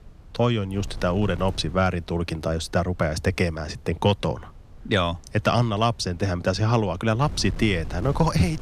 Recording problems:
wind noise on the microphone; occasional gusts; 25 dB below the speech

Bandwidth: 14.5 kHz